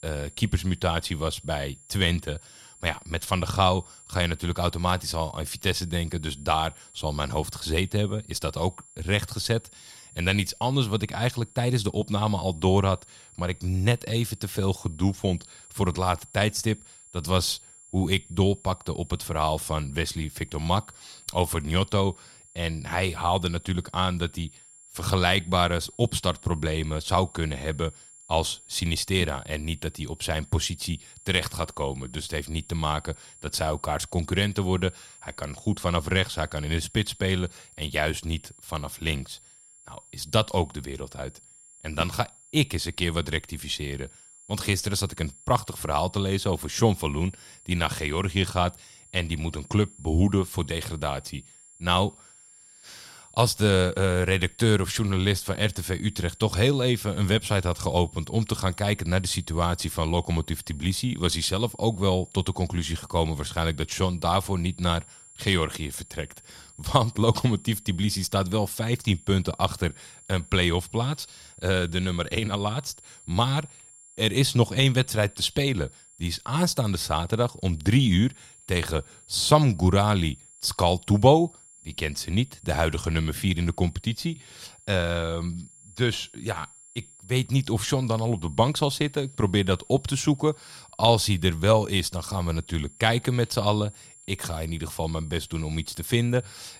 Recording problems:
high-pitched whine; faint; throughout; 7.5 kHz, 25 dB below the speech

